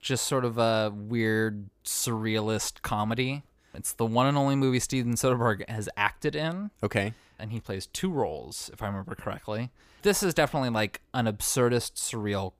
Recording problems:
none

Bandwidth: 15 kHz